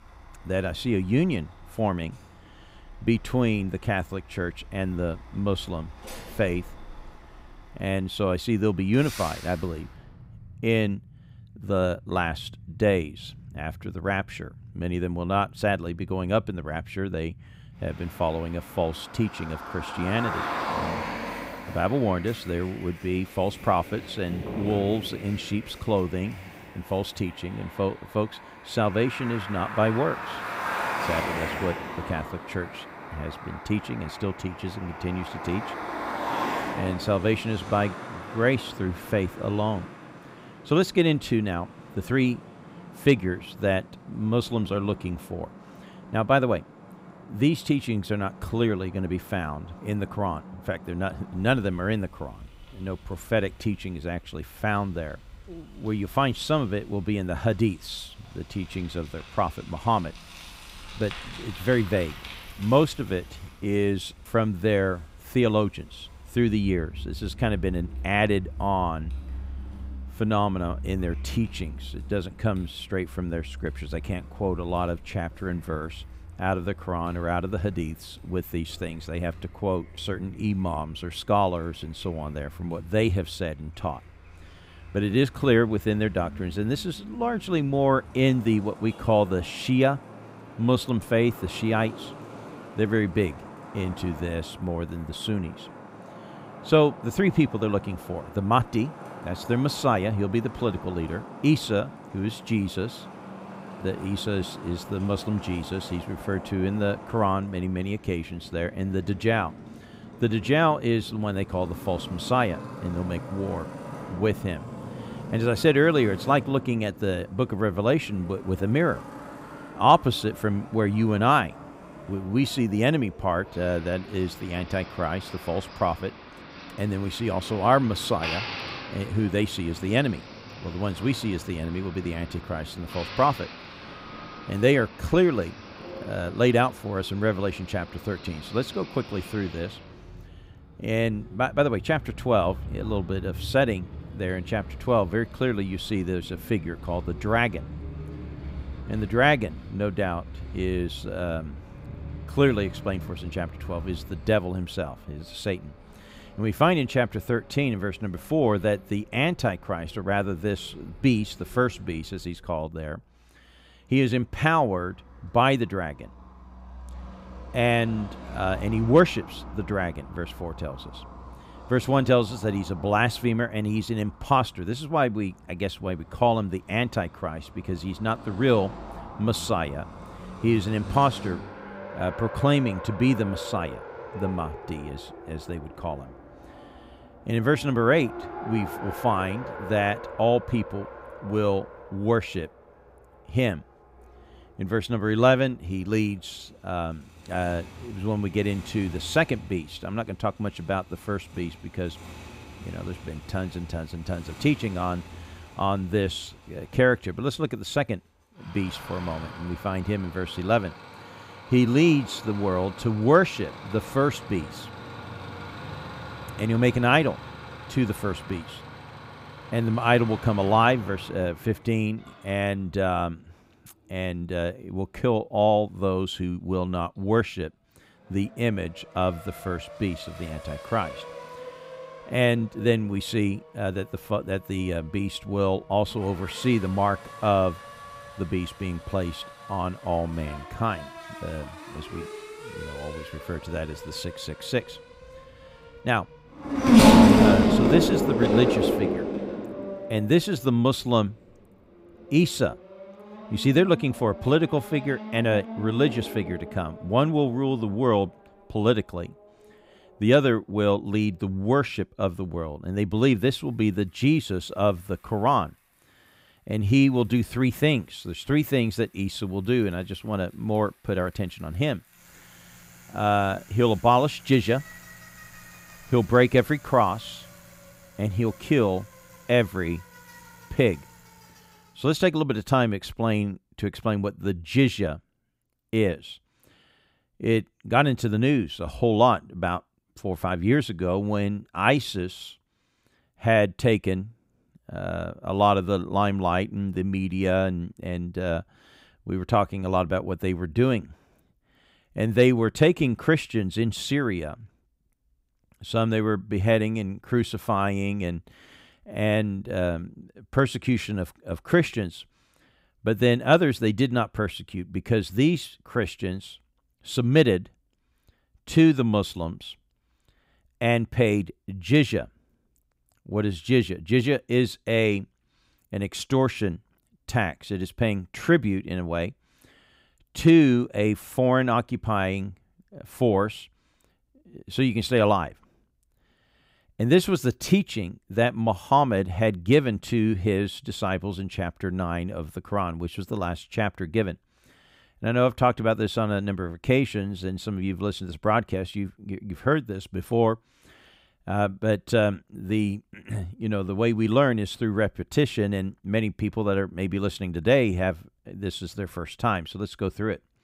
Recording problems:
traffic noise; loud; until 4:42; 9 dB below the speech

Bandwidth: 15.5 kHz